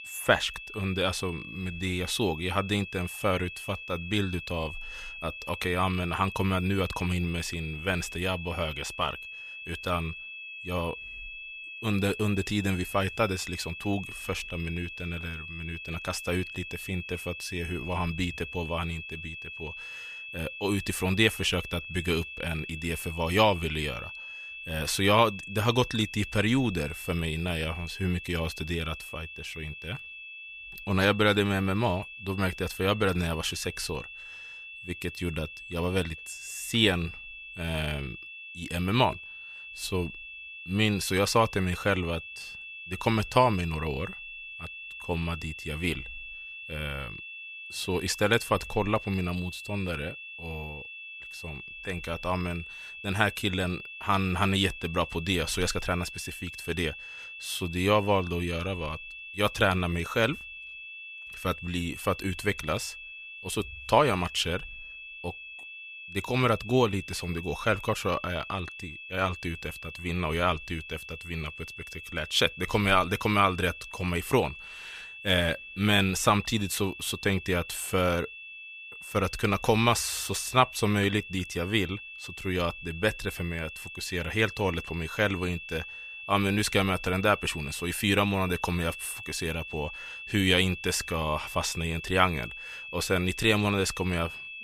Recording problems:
high-pitched whine; noticeable; throughout; 2.5 kHz, 10 dB below the speech

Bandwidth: 14.5 kHz